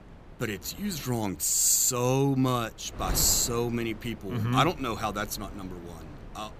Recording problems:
wind noise on the microphone; occasional gusts; 20 dB below the speech

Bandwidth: 14.5 kHz